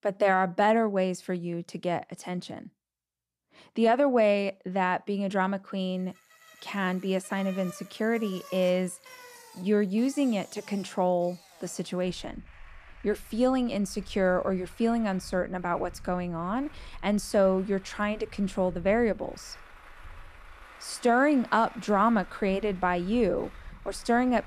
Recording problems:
traffic noise; faint; from 6.5 s on; 20 dB below the speech

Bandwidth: 14.5 kHz